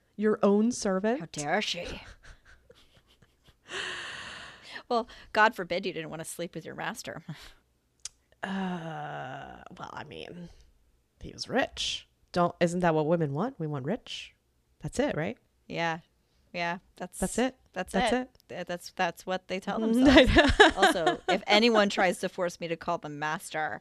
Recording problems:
none

